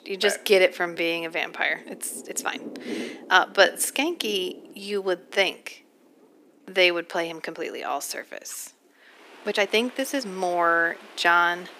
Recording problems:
thin; somewhat; fading below 300 Hz
rain or running water; noticeable; throughout; 20 dB below the speech
uneven, jittery; strongly; from 1 to 11 s

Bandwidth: 15 kHz